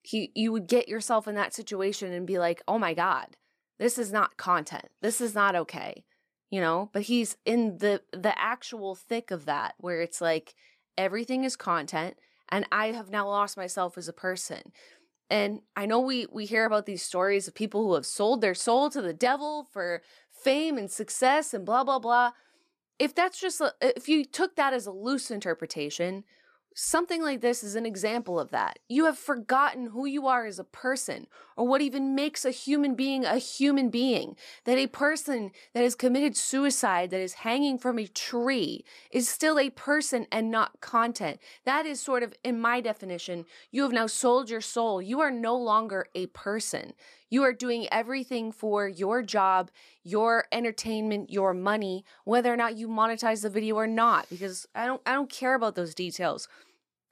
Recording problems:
none

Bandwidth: 14.5 kHz